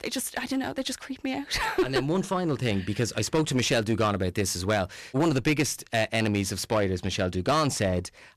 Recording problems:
distortion; slight; 8% of the sound clipped

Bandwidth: 13.5 kHz